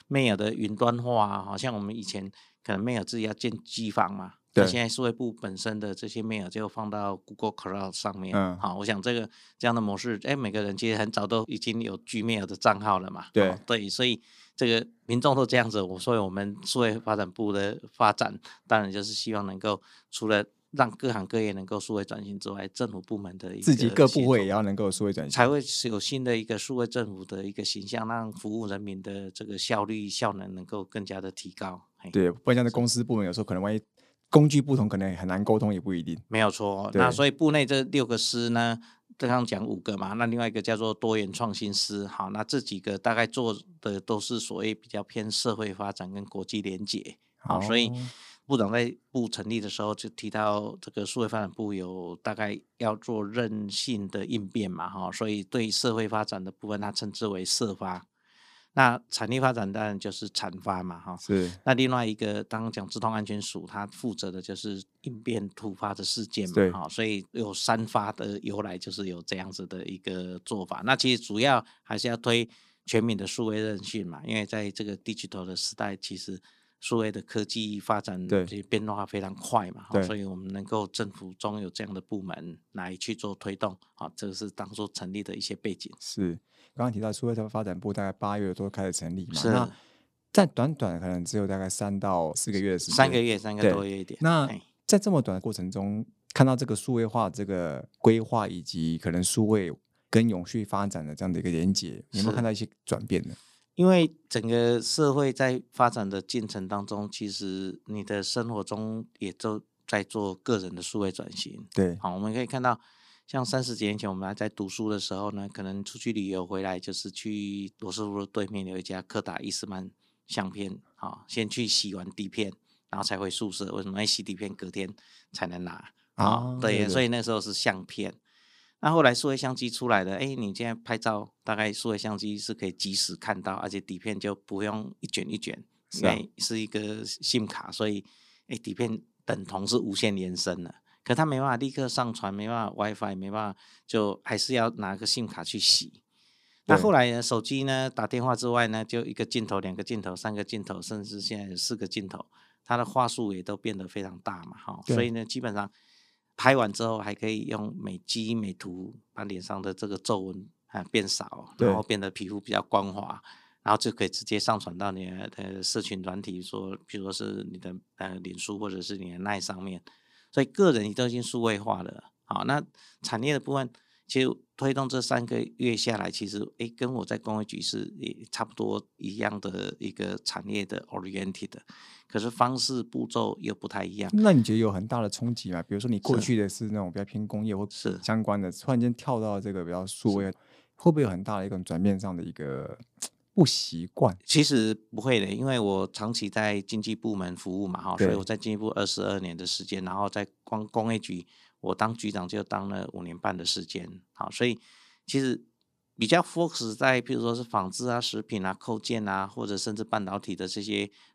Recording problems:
none

